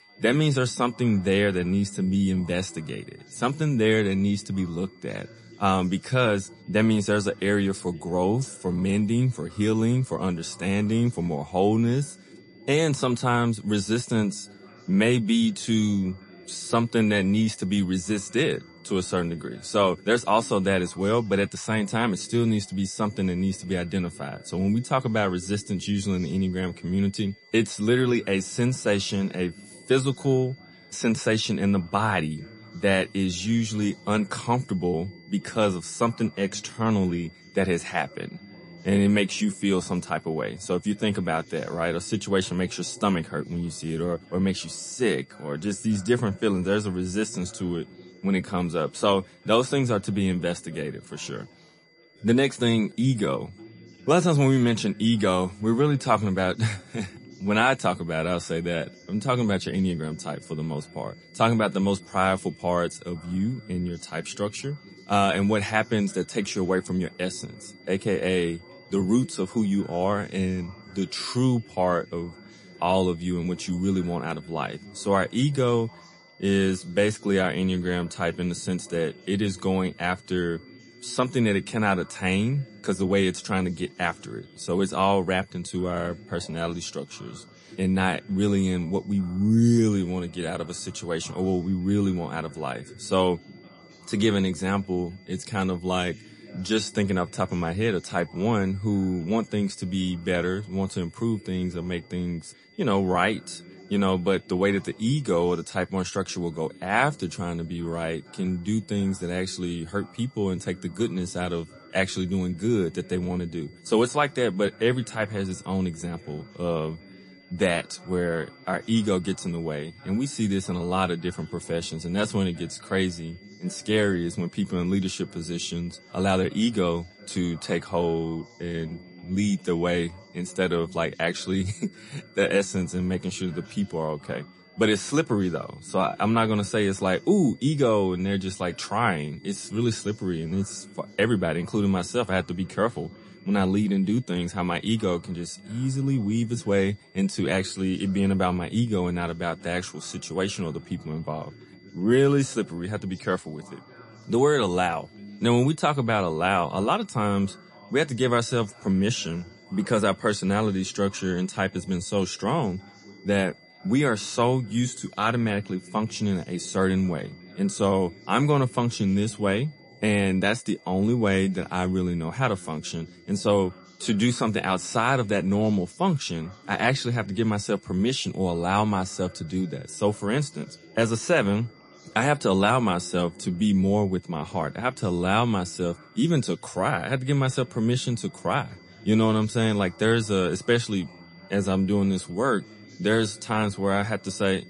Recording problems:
garbled, watery; slightly; nothing above 10.5 kHz
high-pitched whine; faint; throughout; 2 kHz, 30 dB below the speech
chatter from many people; faint; throughout; 25 dB below the speech

